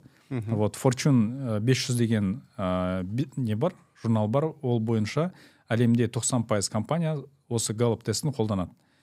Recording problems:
none

